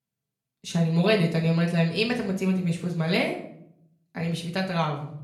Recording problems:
off-mic speech; far
room echo; slight; dies away in 0.6 s

